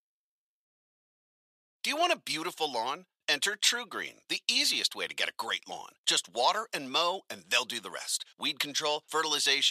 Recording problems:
thin; very; fading below 550 Hz
abrupt cut into speech; at the end

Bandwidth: 14.5 kHz